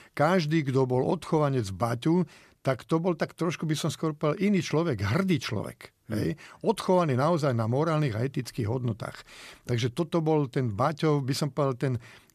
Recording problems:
none

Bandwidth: 14.5 kHz